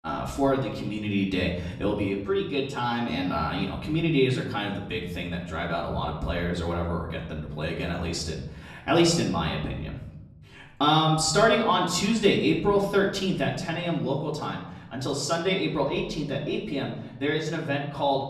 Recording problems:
off-mic speech; far
room echo; slight; dies away in 0.8 s

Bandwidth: 13.5 kHz